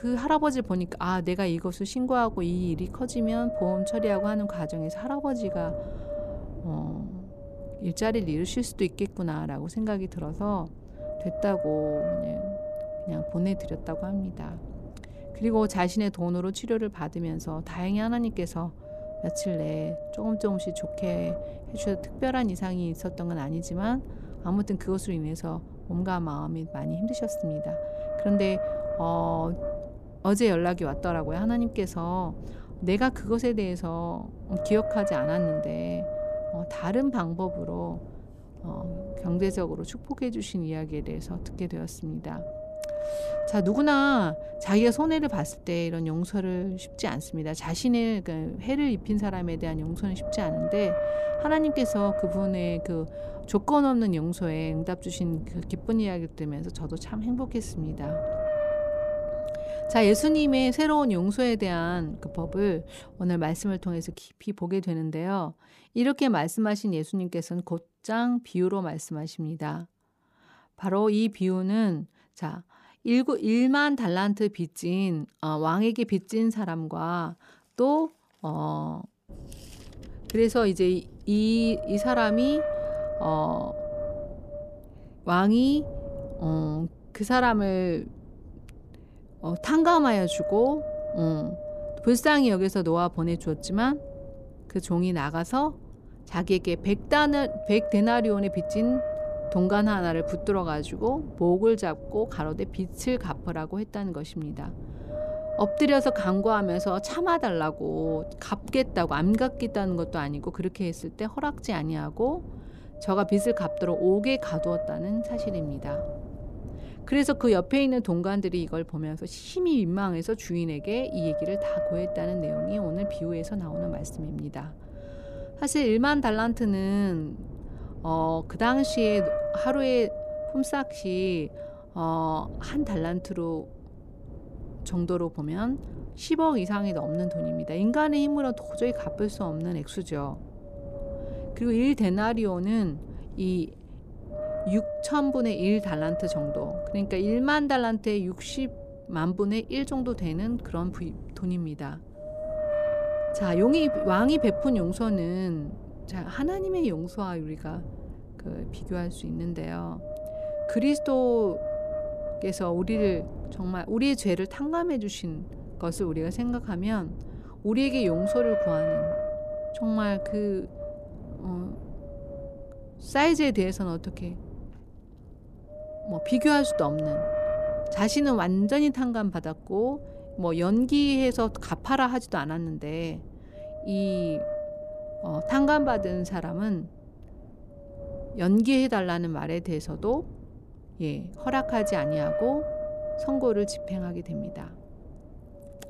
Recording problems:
wind noise on the microphone; heavy; until 1:04 and from 1:19 on; 3 dB below the speech

